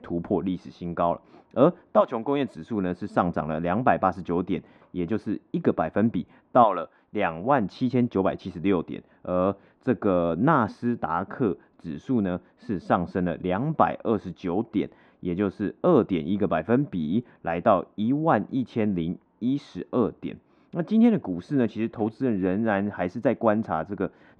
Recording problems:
muffled; very; fading above 1.5 kHz

